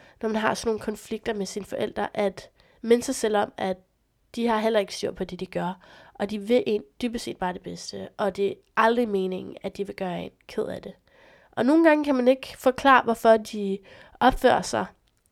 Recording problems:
none

